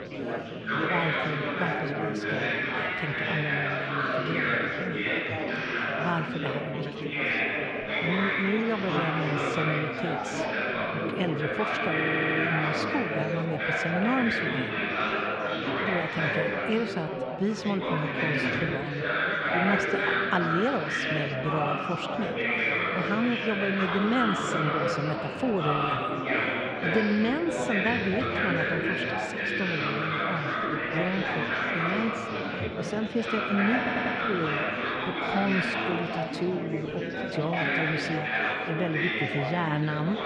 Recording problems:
echo of what is said; noticeable; throughout; 80 ms later, 15 dB below the speech
muffled; slightly; fading above 3 kHz
chatter from many people; very loud; throughout; 4 dB above the speech
audio stuttering; at 12 s and at 34 s

